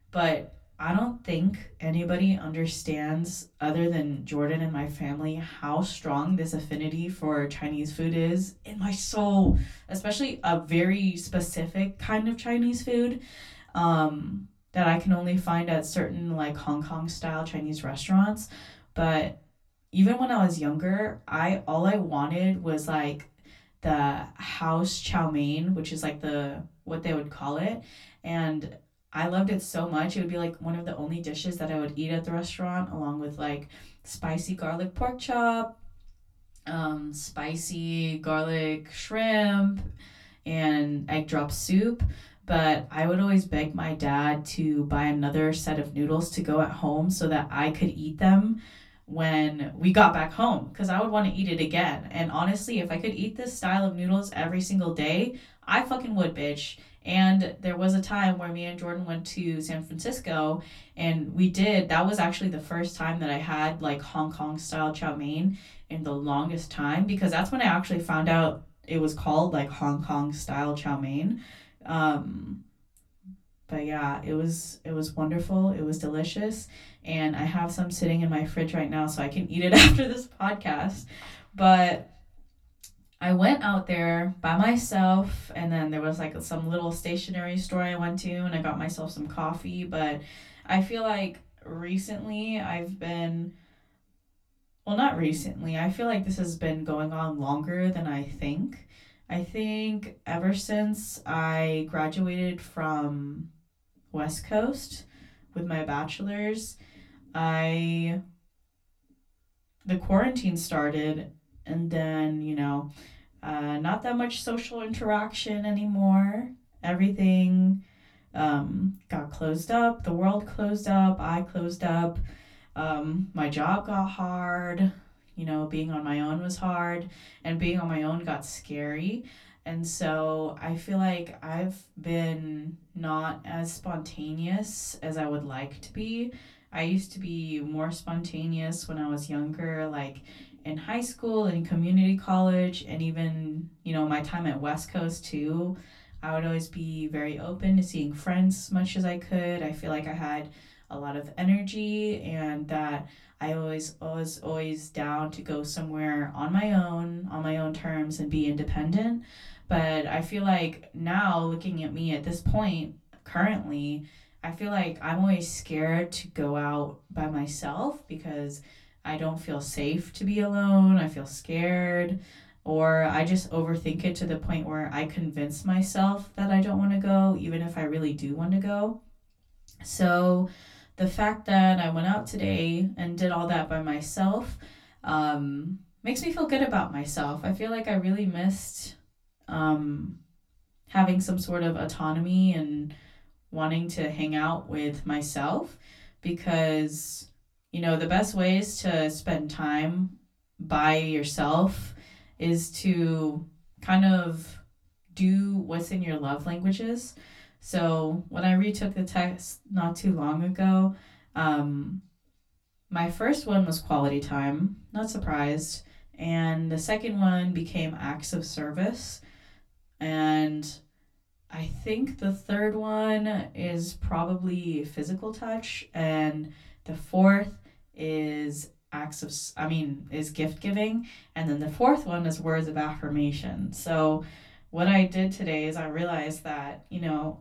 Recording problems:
off-mic speech; far
room echo; very slight; dies away in 0.2 s

